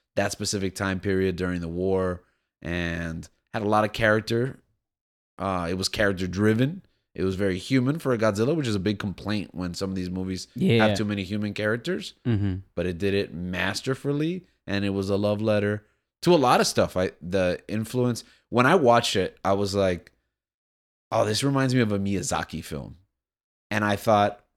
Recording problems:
none

